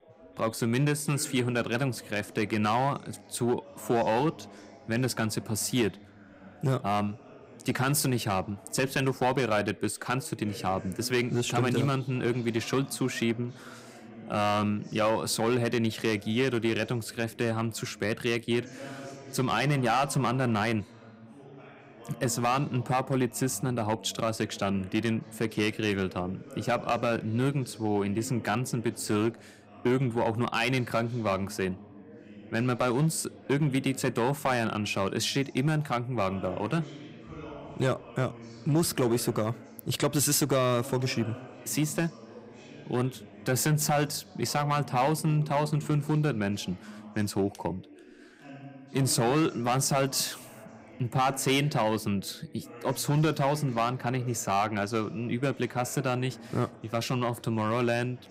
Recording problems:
distortion; slight; 4% of the sound clipped
background chatter; noticeable; throughout; 4 voices, 20 dB below the speech

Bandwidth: 15.5 kHz